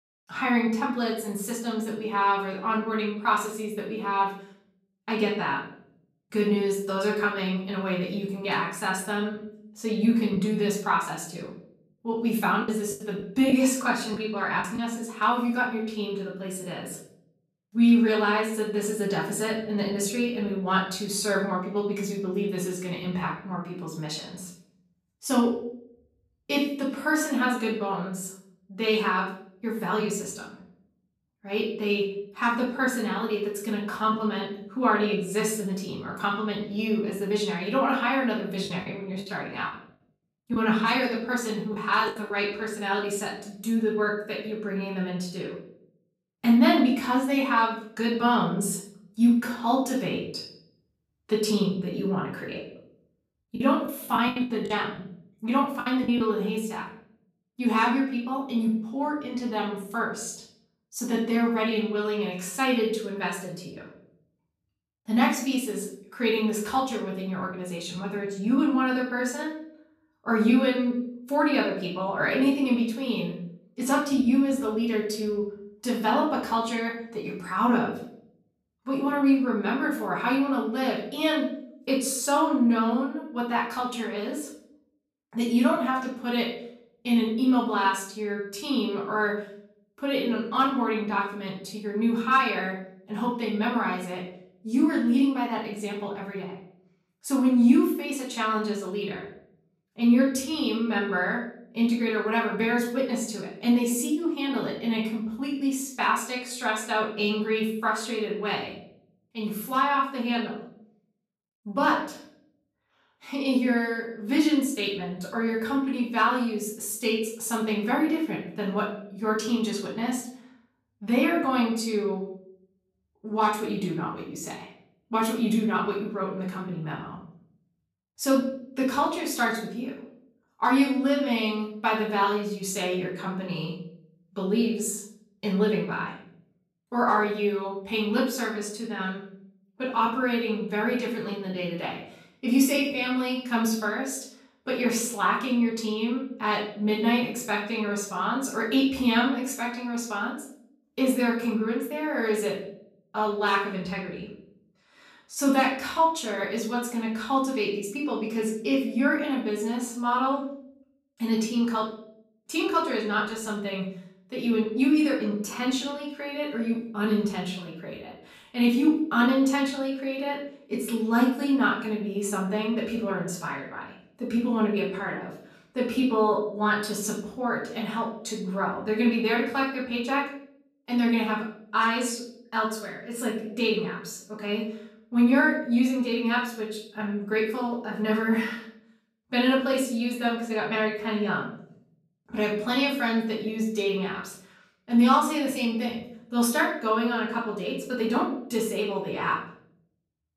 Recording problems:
off-mic speech; far
room echo; noticeable; dies away in 0.6 s
choppy; very; from 10 to 15 s, from 39 to 42 s and from 54 to 56 s; 11% of the speech affected

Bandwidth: 14.5 kHz